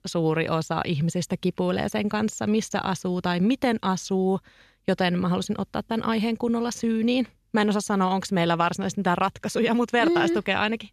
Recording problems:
none

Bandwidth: 14 kHz